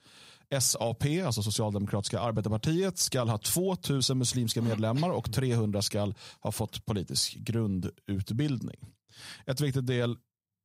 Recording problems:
none

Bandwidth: 15.5 kHz